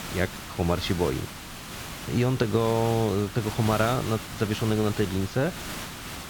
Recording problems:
high frequencies cut off; slight; nothing above 8 kHz
hiss; loud; throughout; 10 dB below the speech

